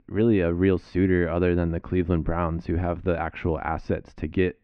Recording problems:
muffled; very; fading above 2.5 kHz

